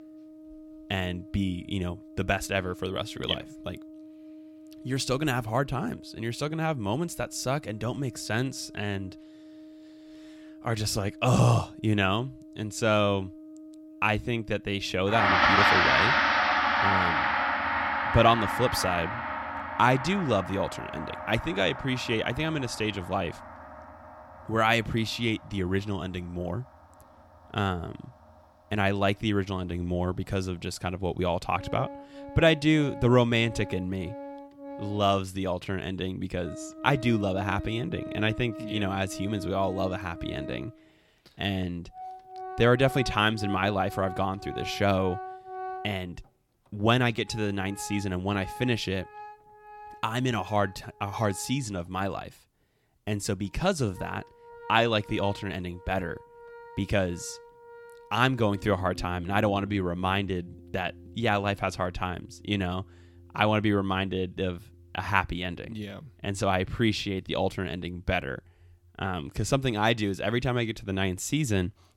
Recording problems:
background music; loud; throughout; 3 dB below the speech

